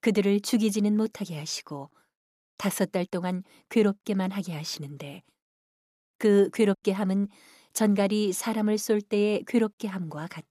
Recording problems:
none

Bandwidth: 14.5 kHz